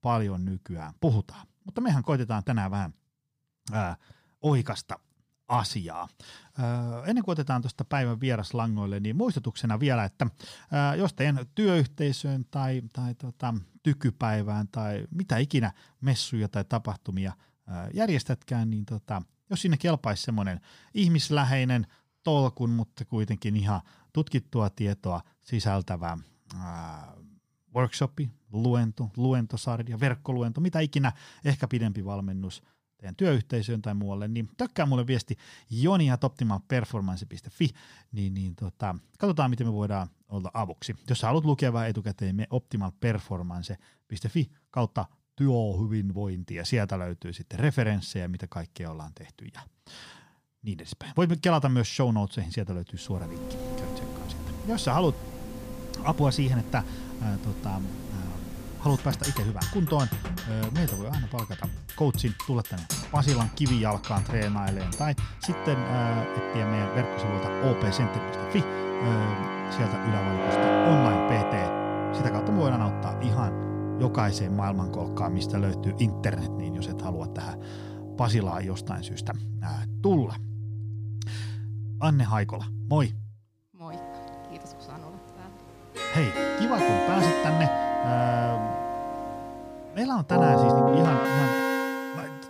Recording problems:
background music; loud; from 53 s on; 1 dB below the speech

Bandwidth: 15 kHz